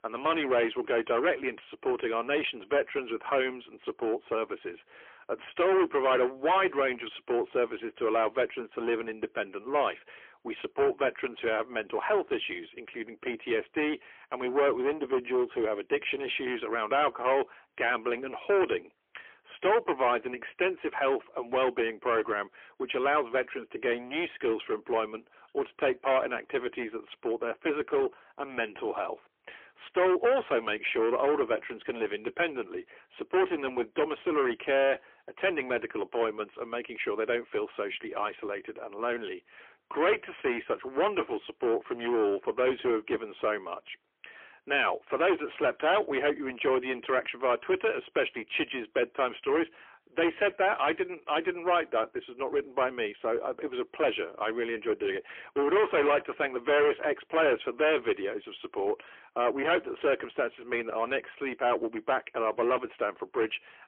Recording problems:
phone-call audio; poor line; nothing above 3.5 kHz
distortion; heavy; 13% of the sound clipped

